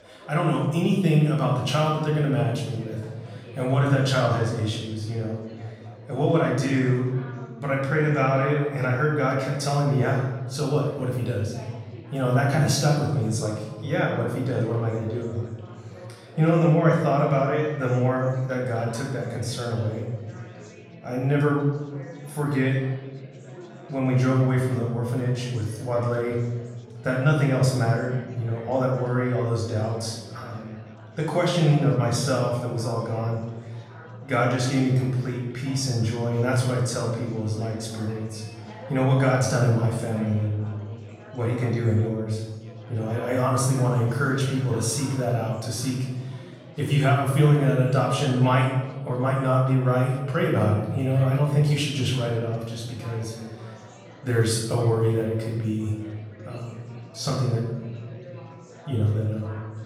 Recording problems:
off-mic speech; far
room echo; noticeable; dies away in 1.2 s
chatter from many people; faint; throughout; 20 dB below the speech

